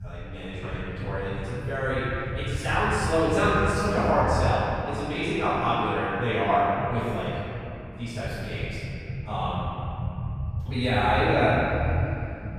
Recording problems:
room echo; strong; dies away in 2.9 s
off-mic speech; far
low rumble; faint; throughout; 25 dB below the speech

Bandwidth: 14.5 kHz